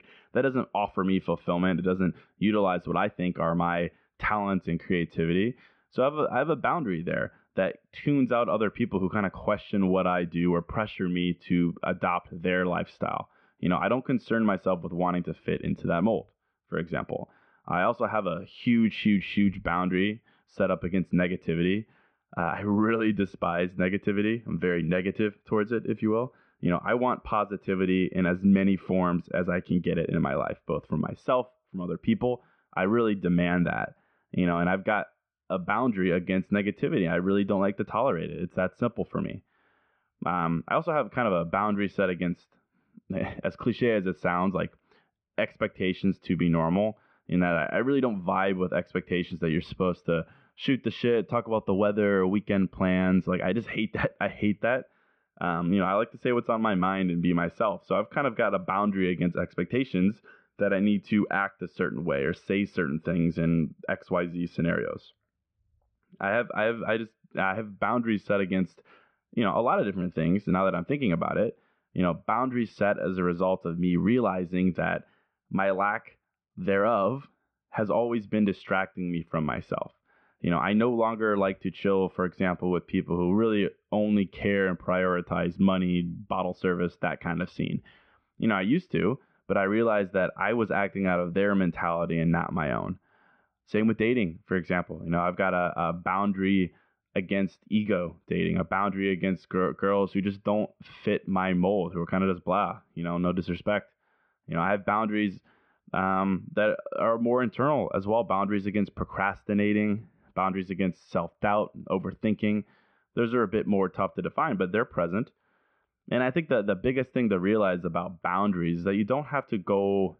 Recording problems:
muffled; very; fading above 2.5 kHz

